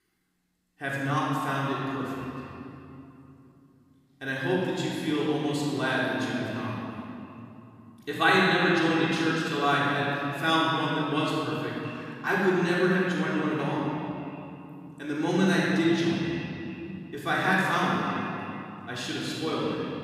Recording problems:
room echo; strong; dies away in 2.4 s
off-mic speech; far
echo of what is said; noticeable; throughout; 340 ms later, 15 dB below the speech

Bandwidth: 15.5 kHz